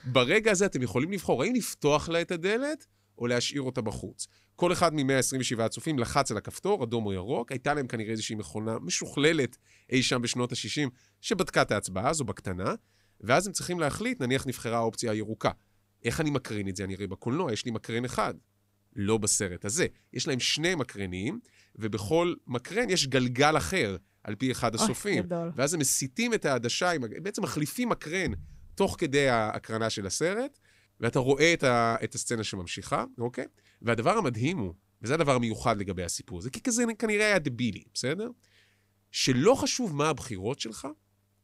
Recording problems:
none

